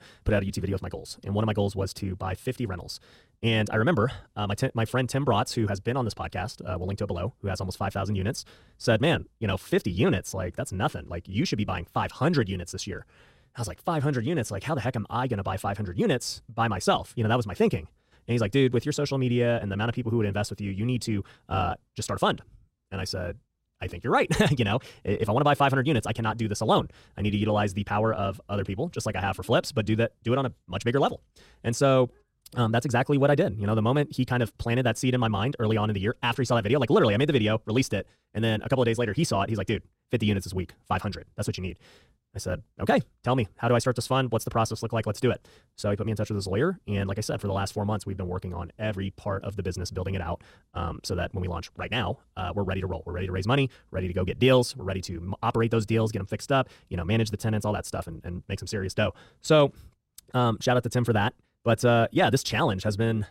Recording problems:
wrong speed, natural pitch; too fast; 1.6 times normal speed

